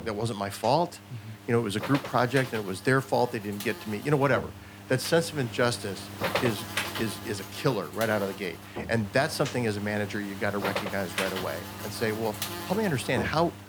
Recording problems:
electrical hum; loud; throughout; 50 Hz, 7 dB below the speech

